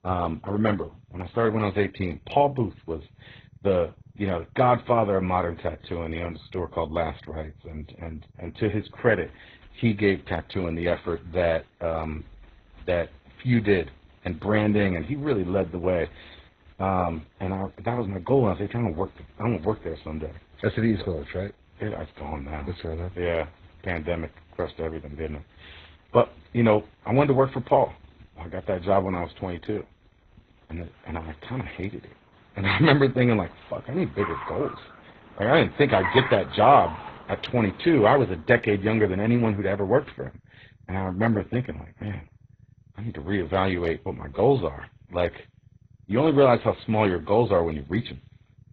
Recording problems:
garbled, watery; badly; nothing above 4 kHz
traffic noise; noticeable; throughout; 20 dB below the speech

